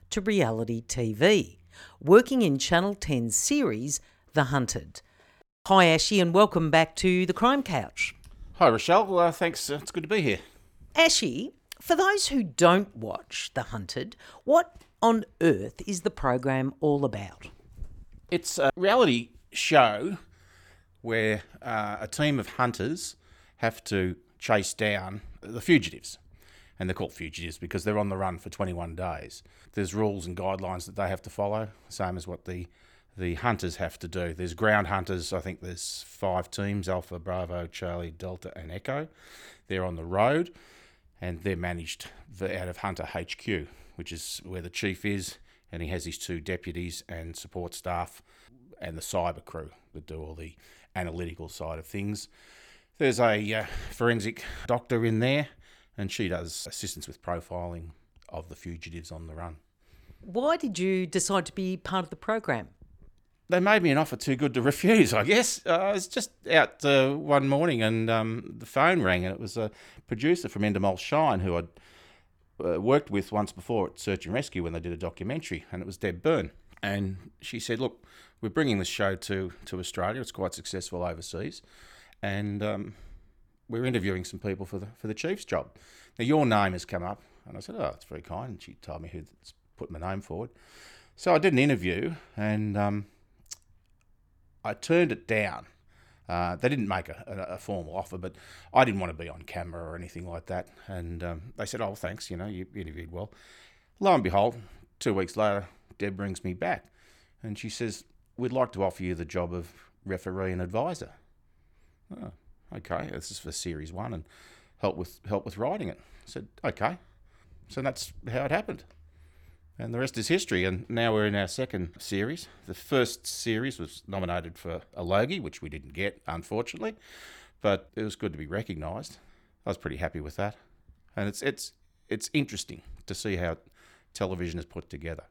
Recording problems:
none

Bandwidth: 19 kHz